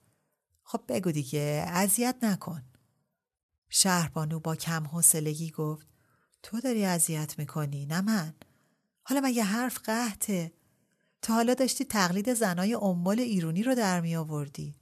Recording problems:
none

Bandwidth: 13.5 kHz